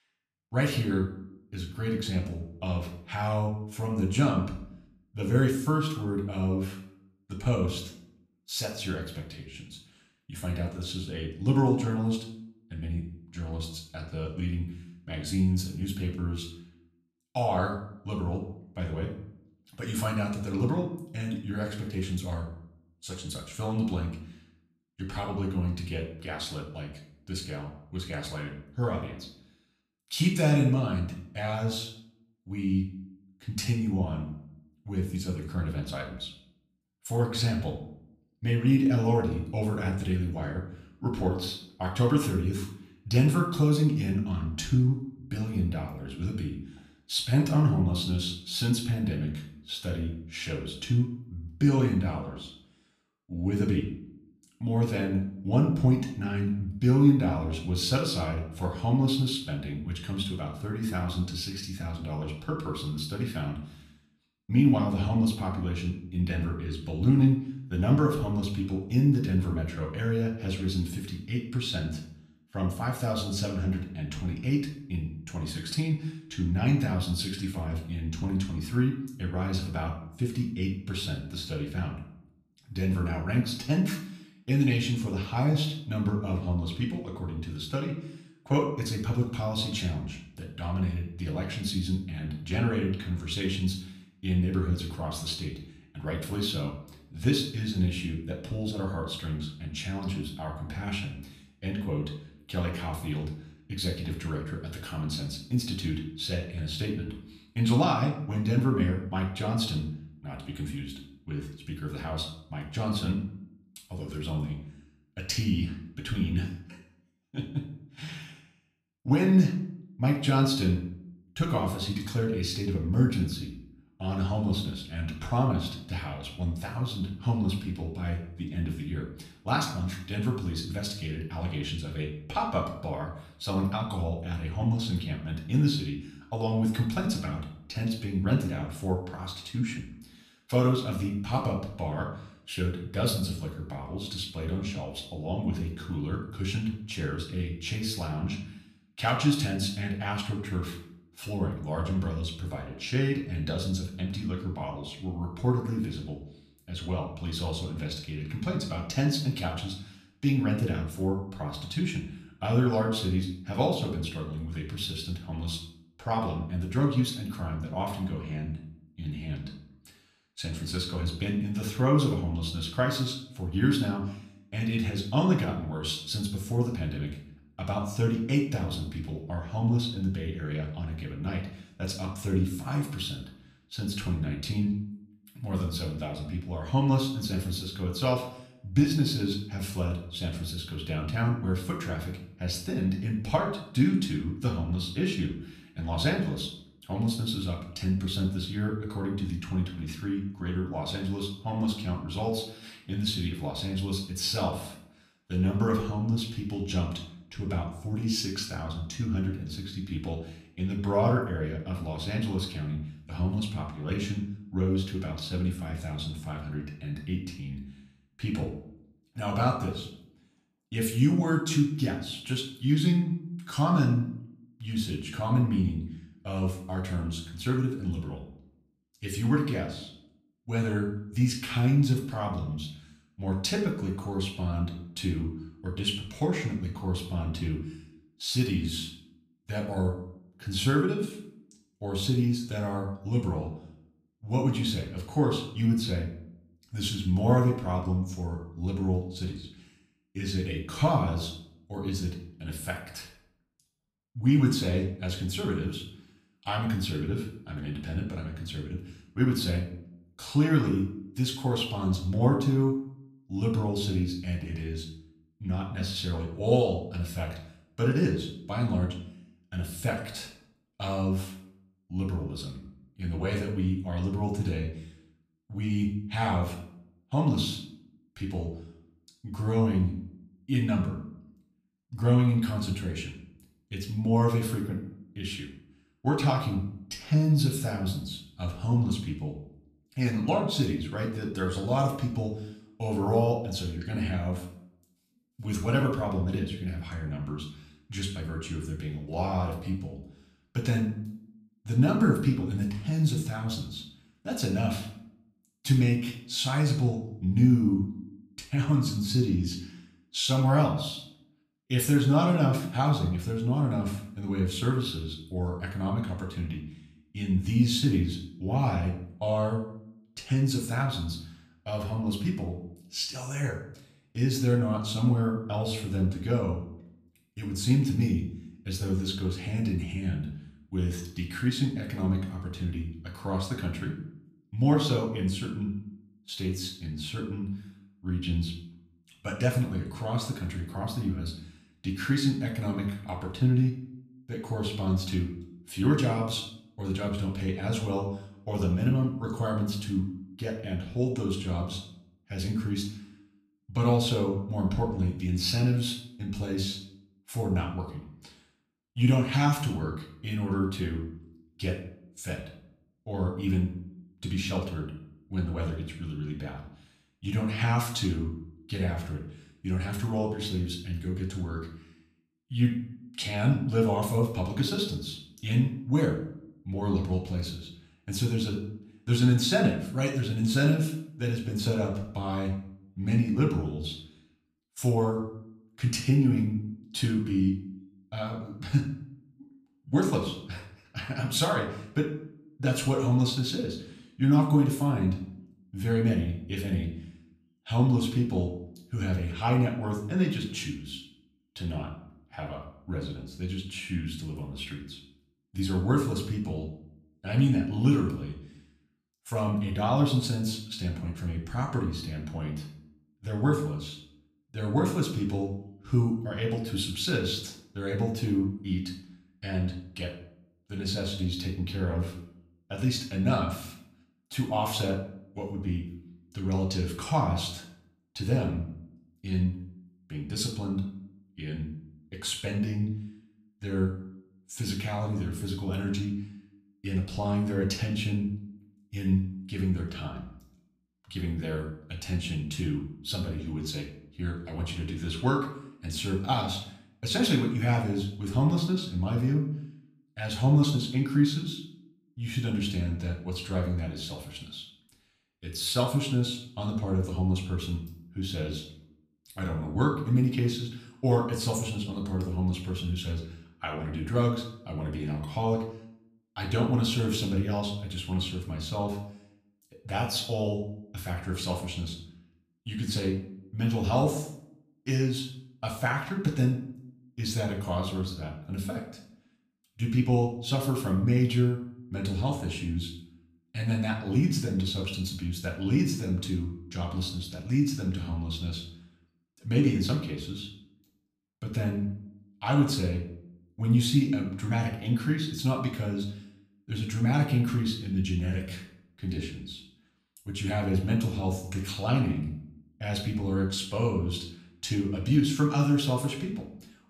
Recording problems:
off-mic speech; far
room echo; slight; dies away in 0.5 s

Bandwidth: 14.5 kHz